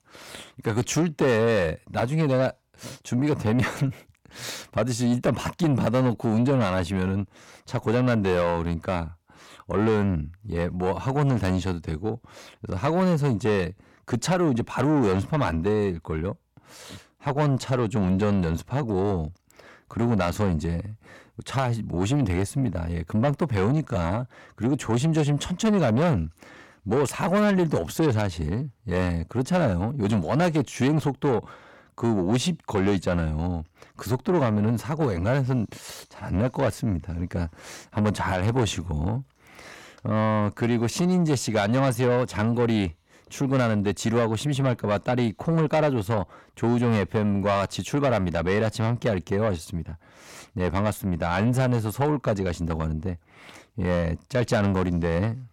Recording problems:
distortion; slight; 9 dB below the speech

